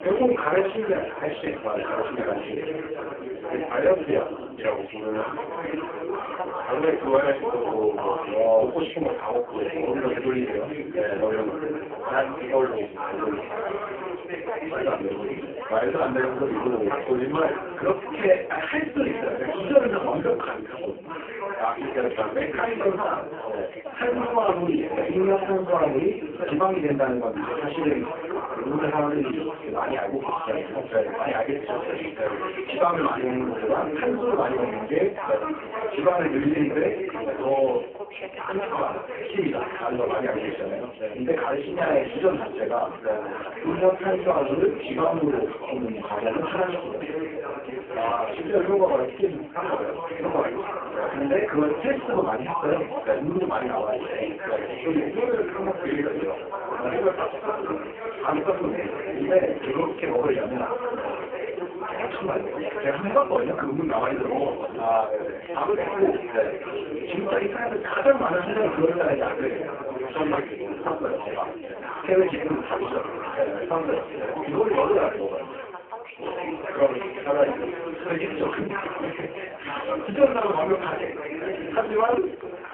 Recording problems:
phone-call audio; poor line
off-mic speech; far
room echo; slight; dies away in 0.3 s
background chatter; loud; throughout; 3 voices, 6 dB below the speech
household noises; faint; from 45 s on; 30 dB below the speech

